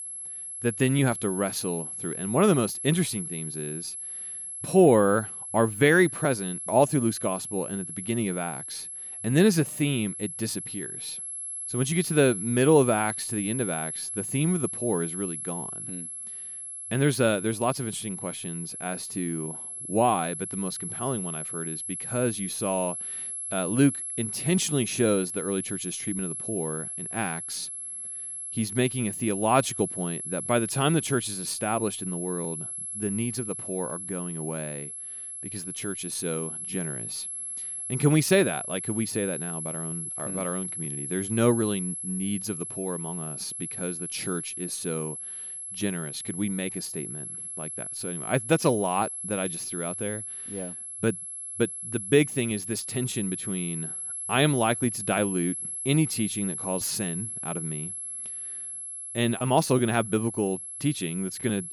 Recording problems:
high-pitched whine; loud; throughout; 11 kHz, 5 dB below the speech

